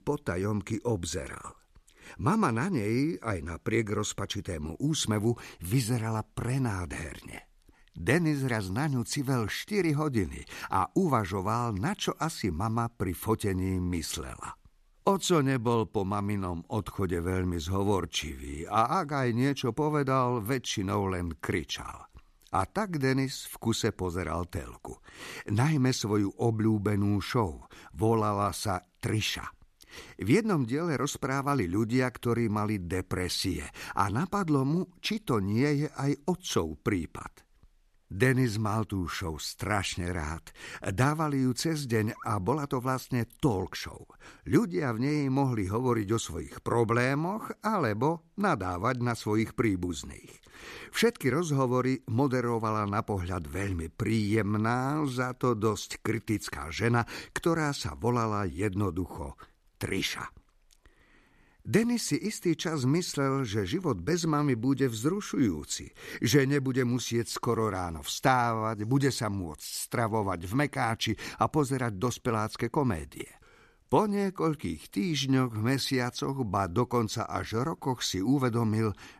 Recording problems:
none

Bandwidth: 14 kHz